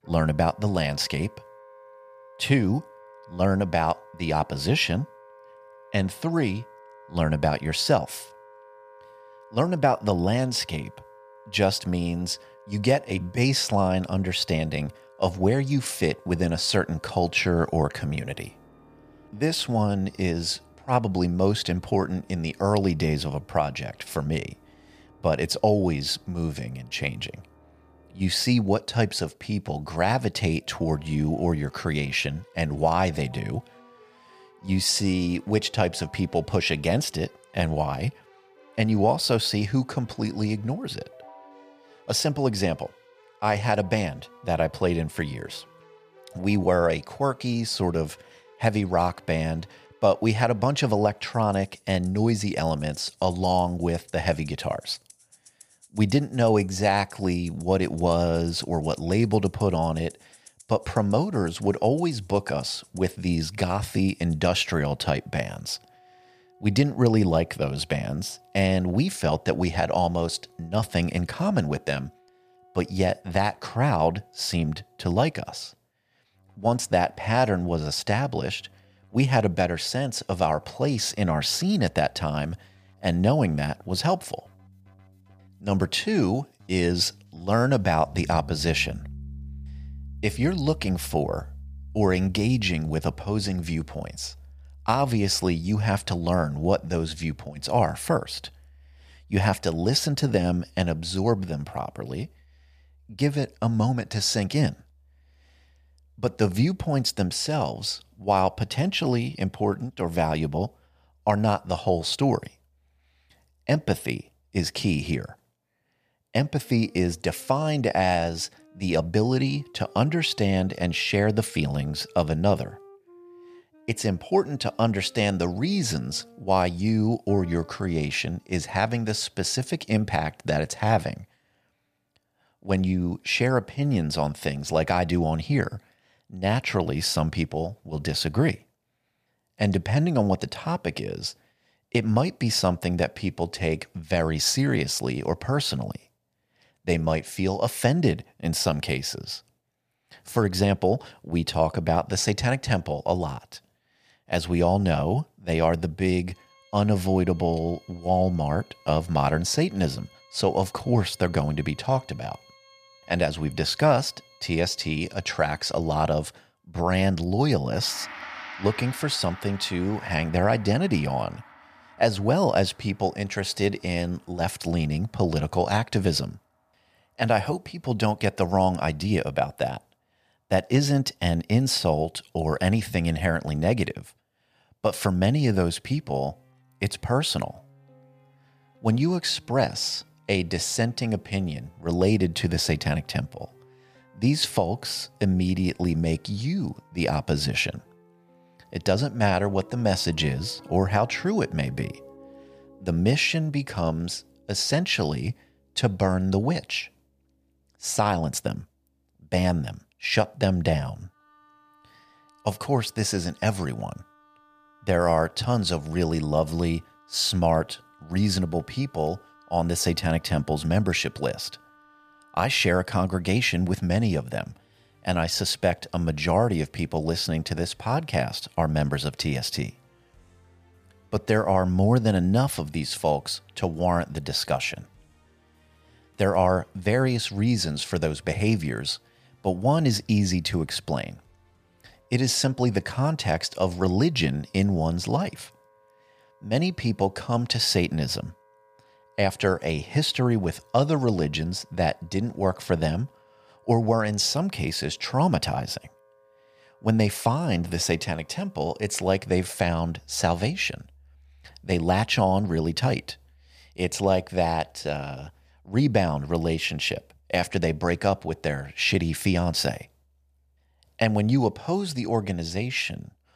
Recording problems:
background music; faint; throughout; 25 dB below the speech

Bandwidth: 15 kHz